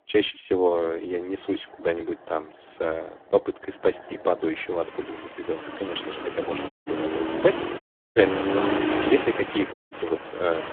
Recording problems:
phone-call audio; poor line; nothing above 3.5 kHz
traffic noise; loud; throughout; 3 dB below the speech
audio cutting out; at 6.5 s, at 8 s and at 9.5 s

